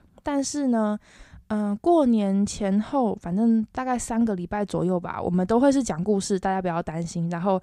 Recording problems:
none

